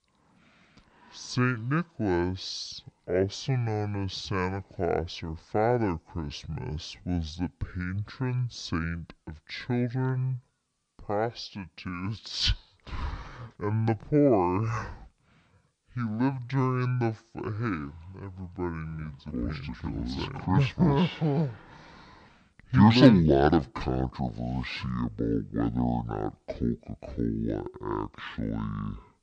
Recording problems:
wrong speed and pitch; too slow and too low; 0.5 times normal speed

